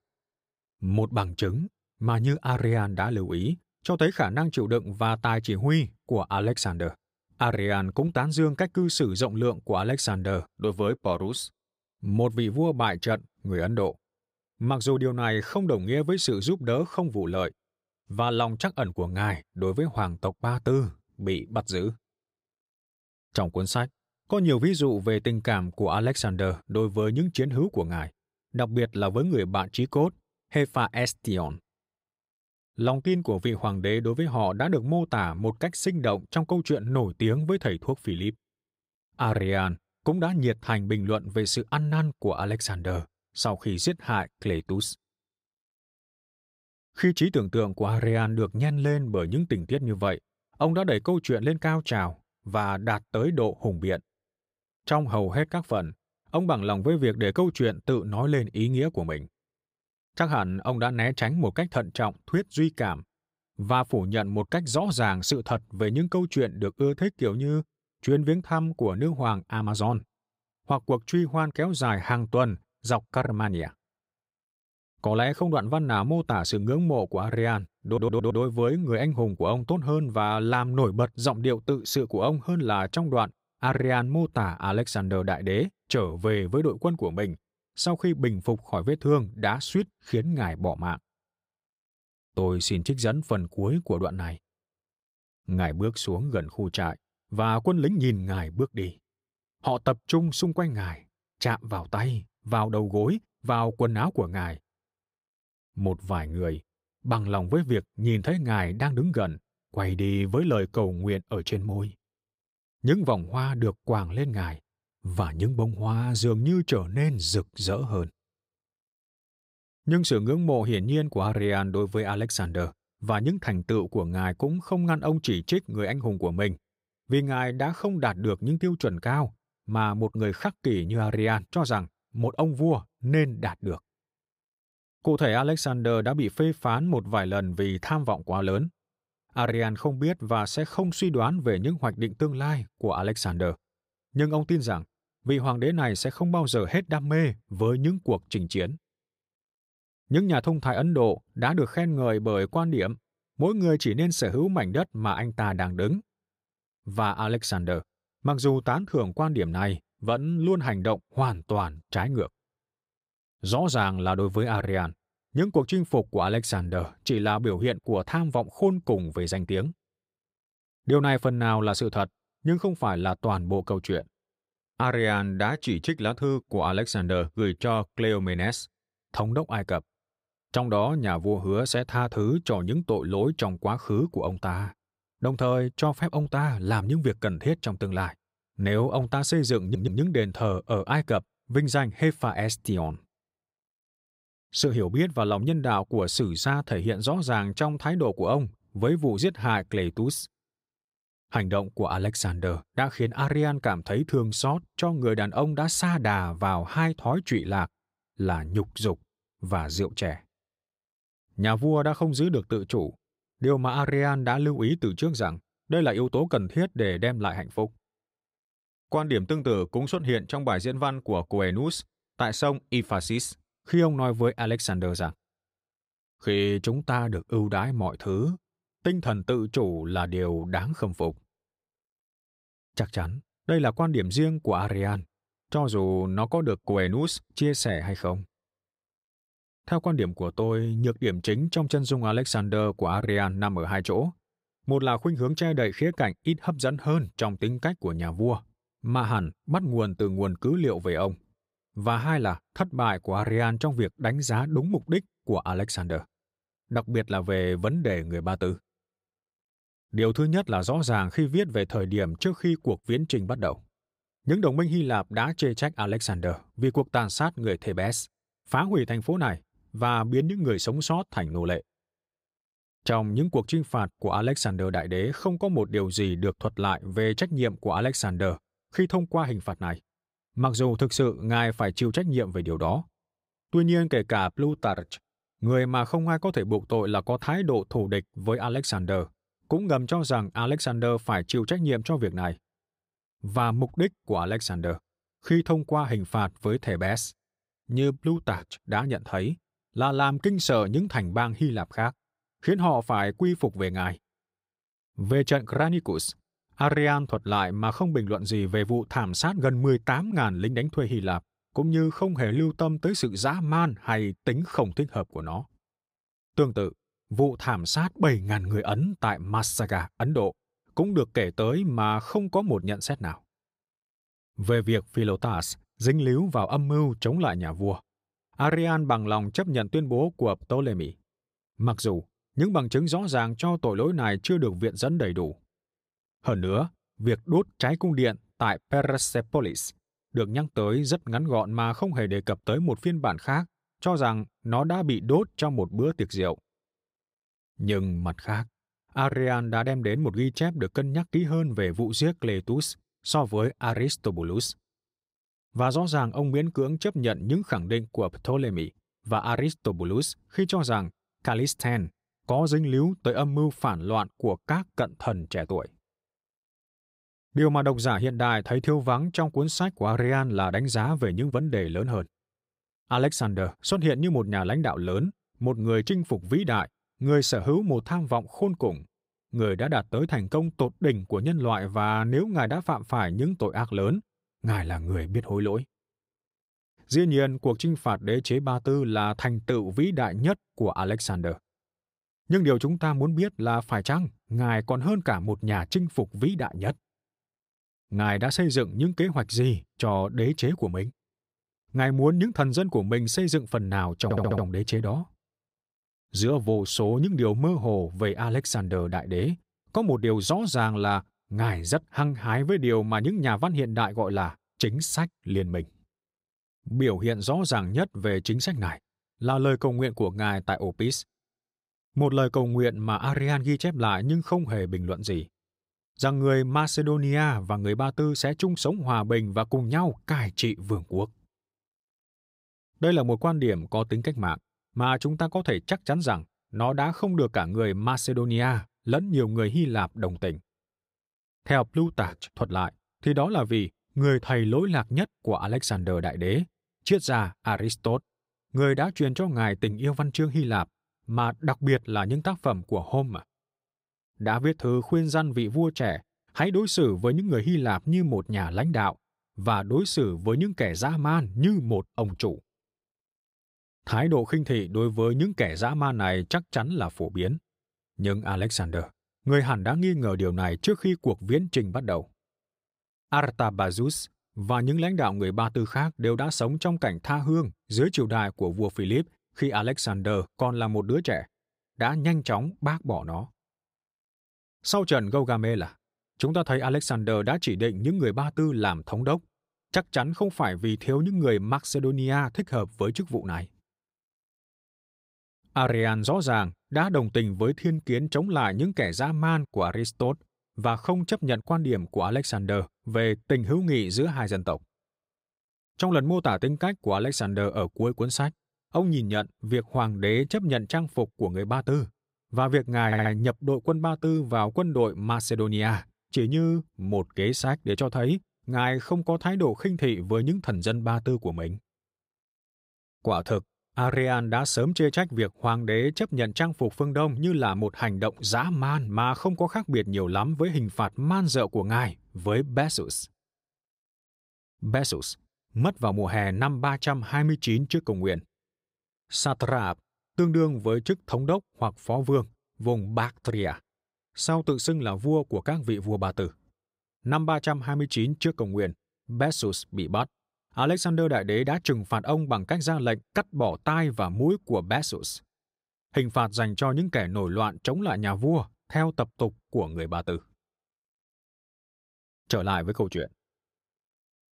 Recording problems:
audio stuttering; 4 times, first at 1:18

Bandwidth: 15.5 kHz